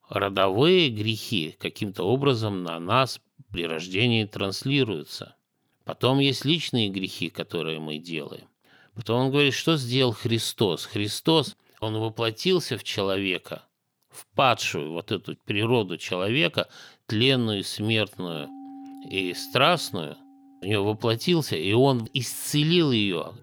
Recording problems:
background music; faint; from 18 s on; 20 dB below the speech

